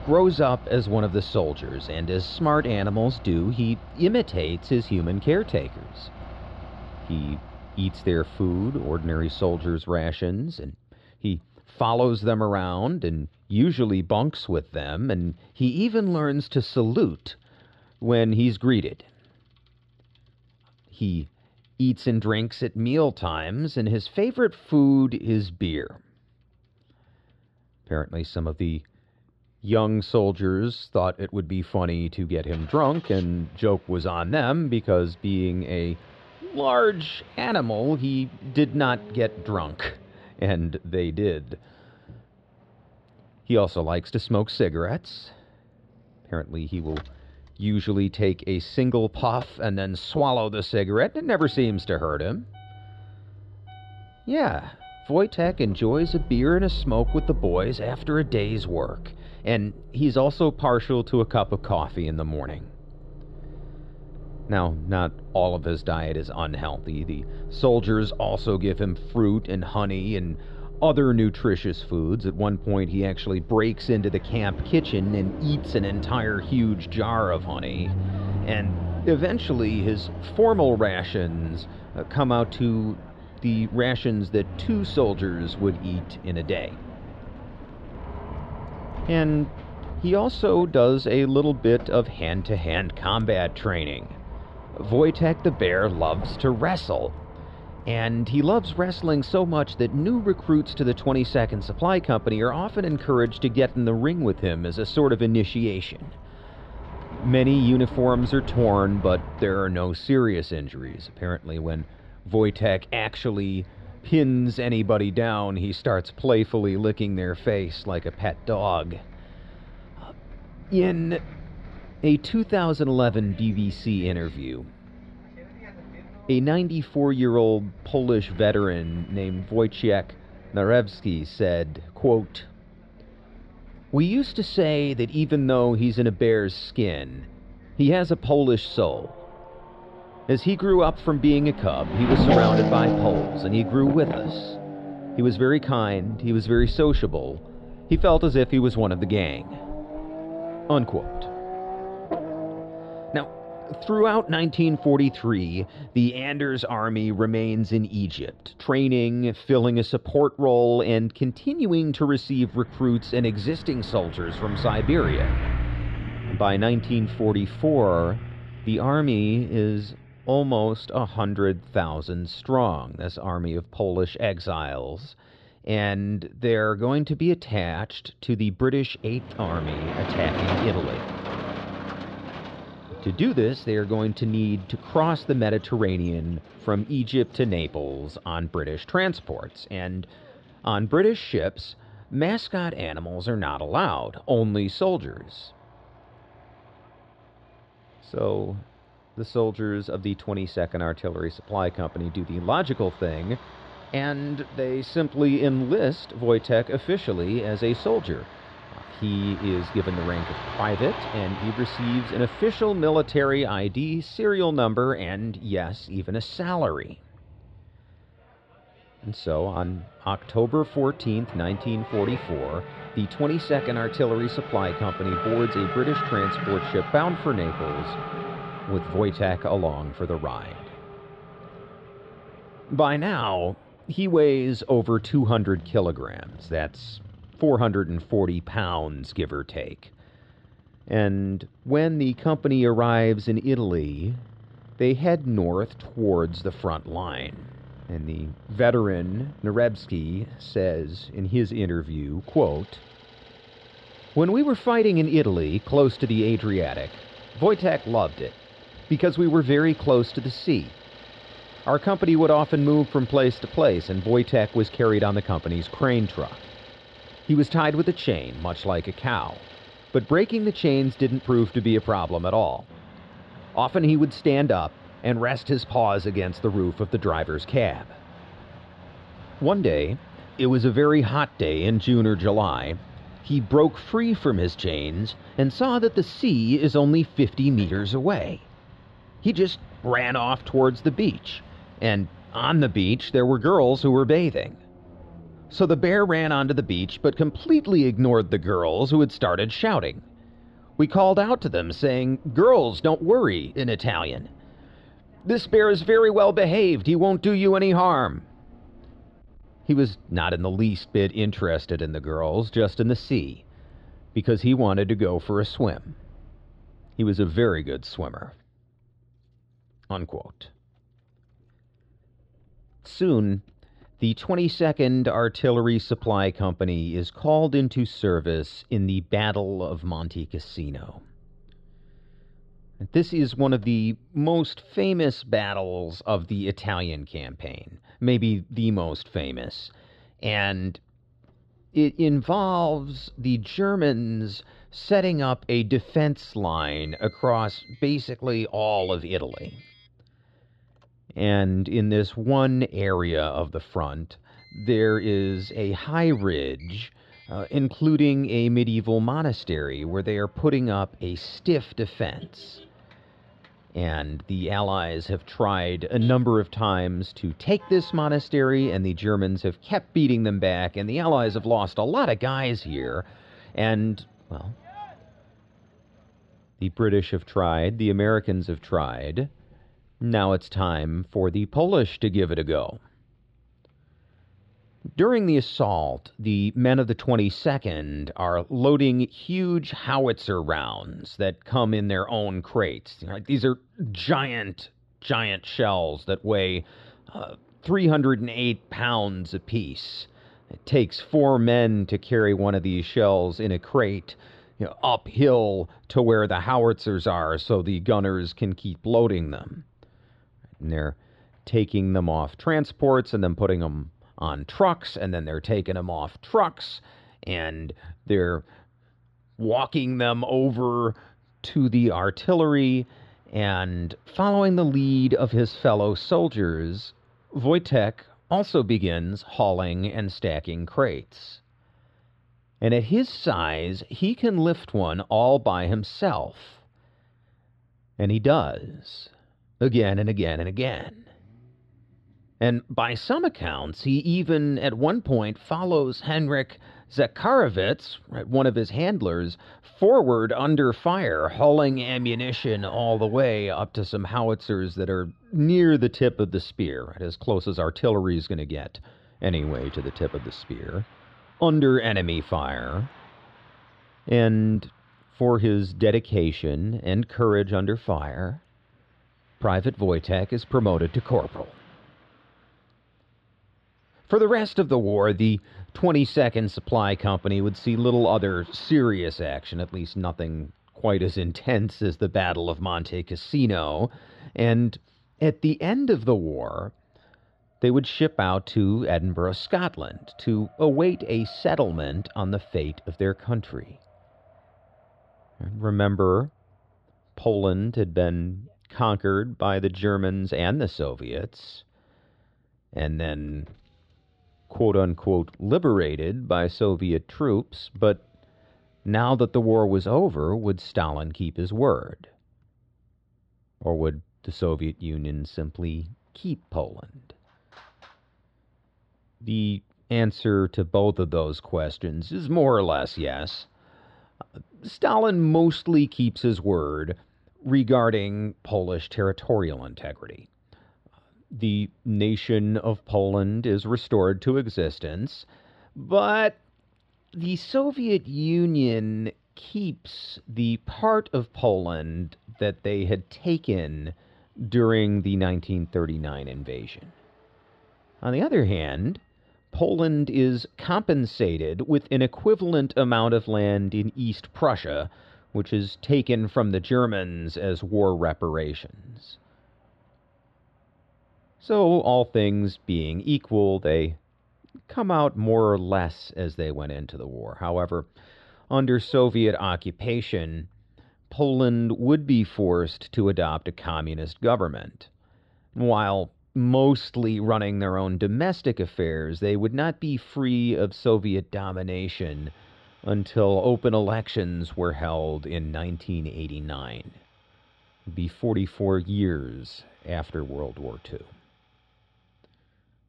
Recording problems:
muffled; slightly; fading above 4 kHz
traffic noise; noticeable; throughout; 15 dB below the speech
uneven, jittery; slightly; from 2:39 to 9:15

